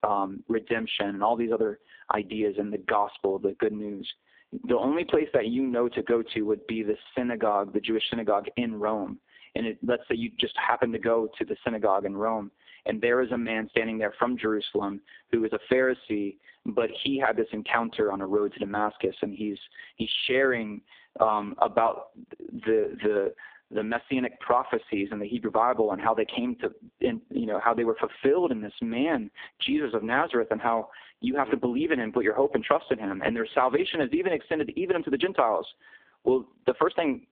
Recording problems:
phone-call audio; poor line
squashed, flat; somewhat

